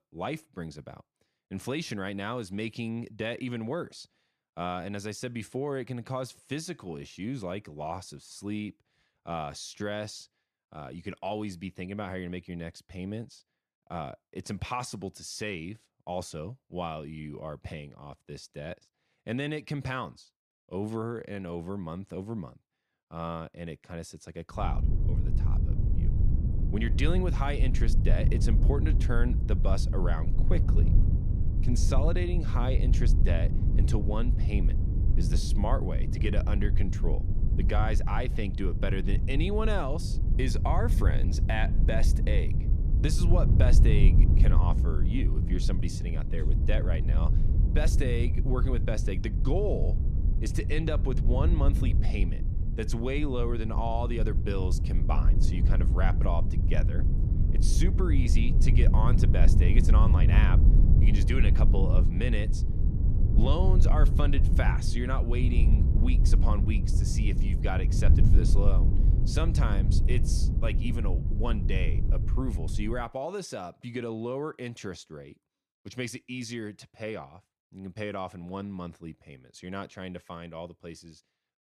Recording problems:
low rumble; loud; from 25 s to 1:13; 6 dB below the speech

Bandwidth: 14.5 kHz